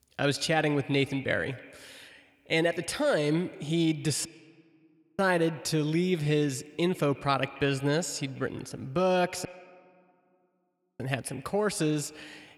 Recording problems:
echo of what is said; faint; throughout; 130 ms later, 20 dB below the speech
audio cutting out; at 4.5 s for 1 s and at 9.5 s for 1.5 s

